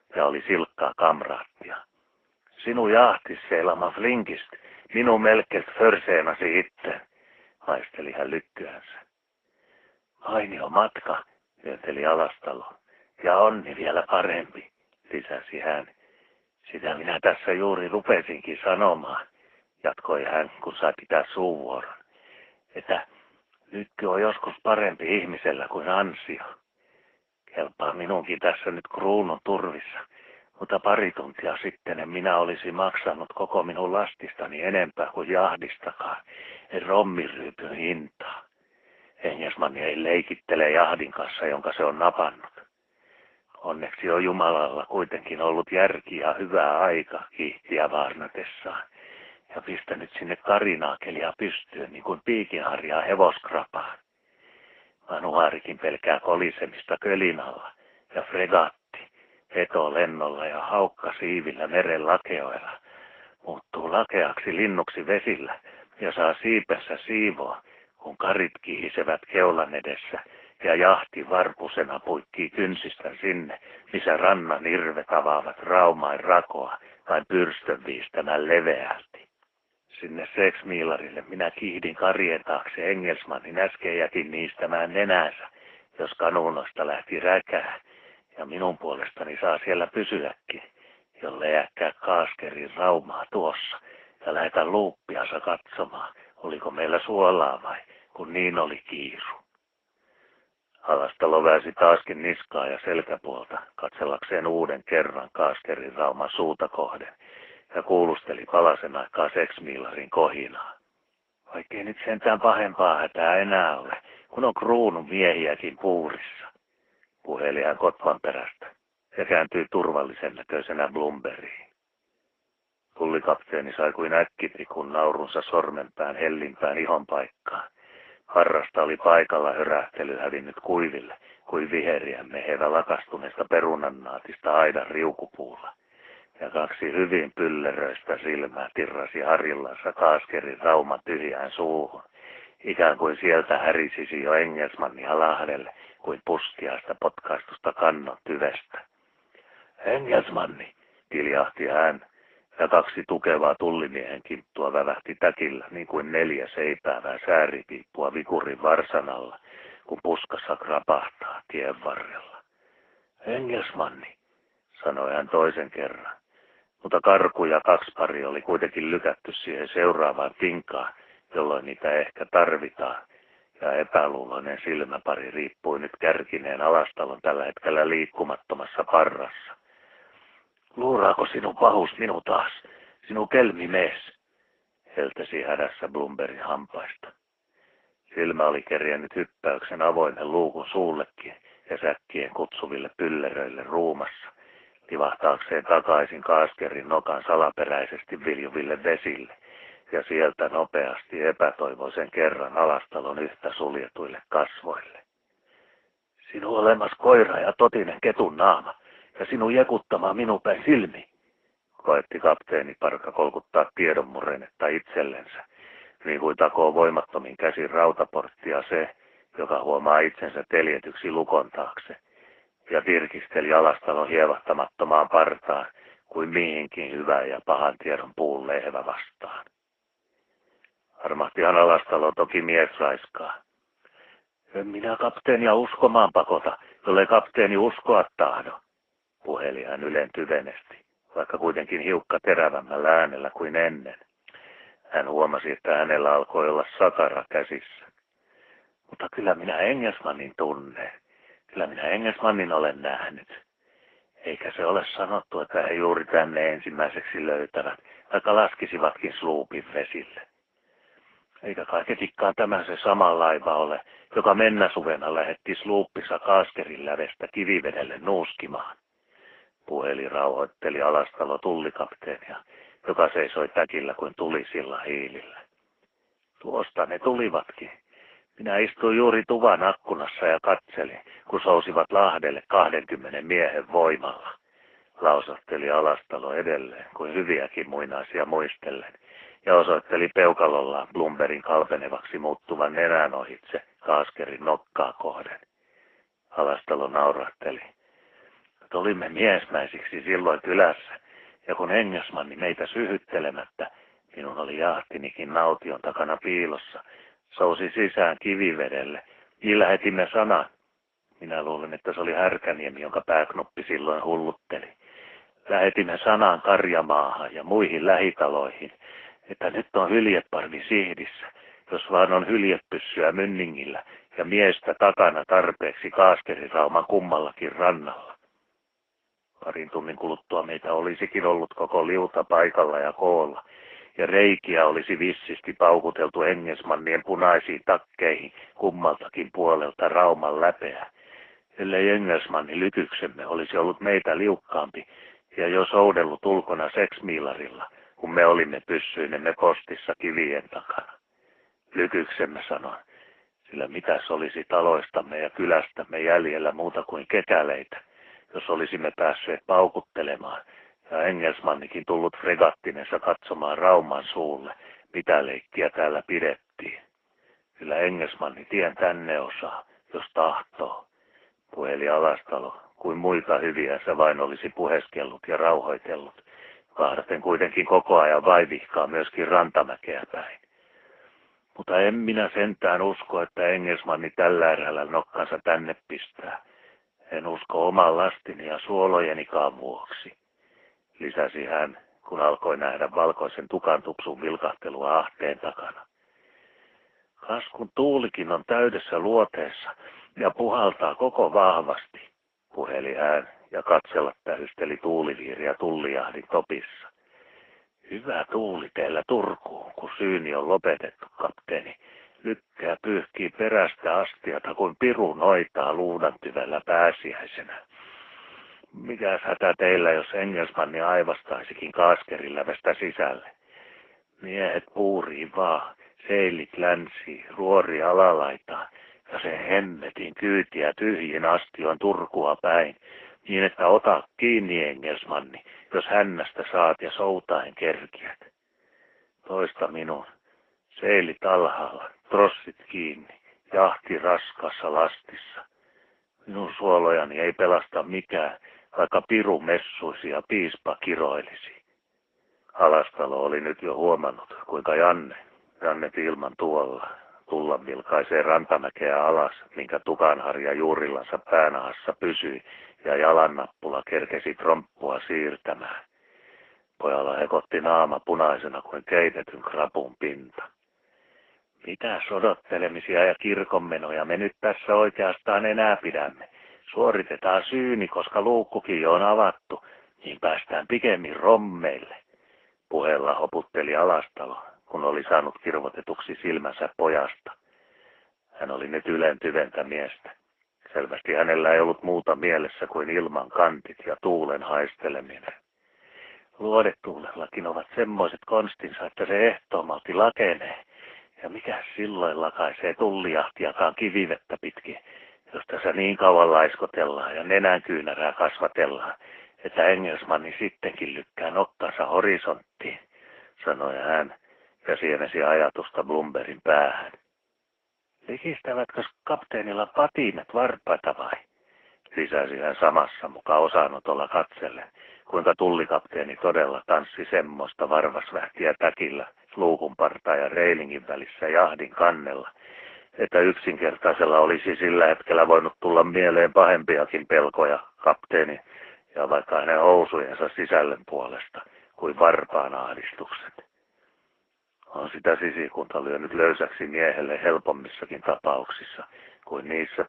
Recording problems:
phone-call audio
garbled, watery; slightly

